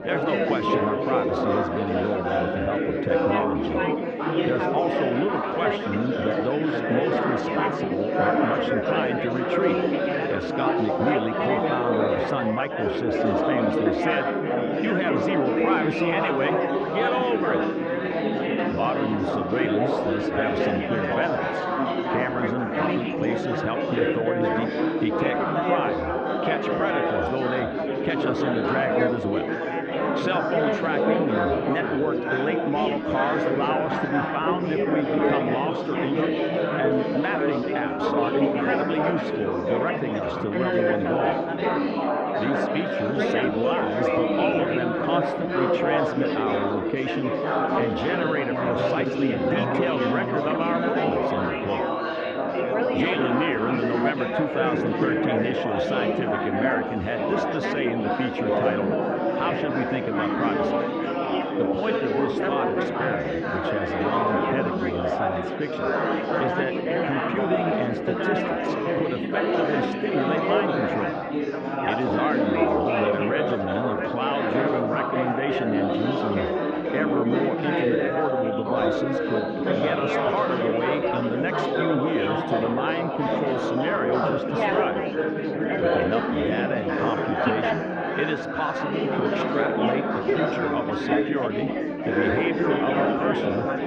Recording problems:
muffled; very; fading above 3 kHz
chatter from many people; very loud; throughout; 4 dB above the speech

